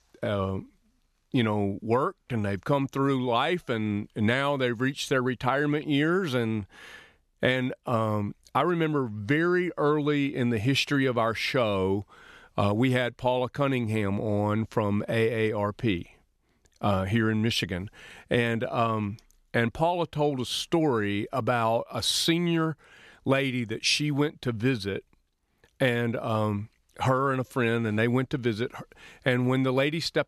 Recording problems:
none

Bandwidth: 13.5 kHz